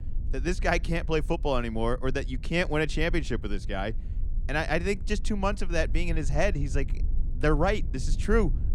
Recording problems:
low rumble; faint; throughout; 25 dB below the speech

